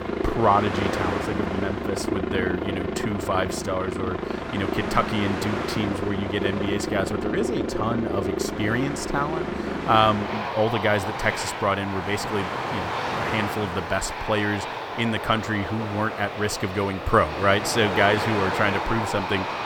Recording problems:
train or aircraft noise; loud; throughout; 3 dB below the speech

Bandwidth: 17 kHz